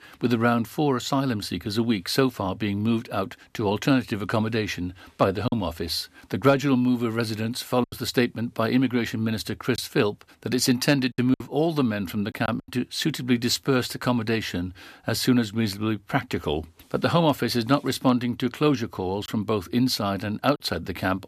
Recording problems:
choppy; occasionally; 2% of the speech affected

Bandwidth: 14.5 kHz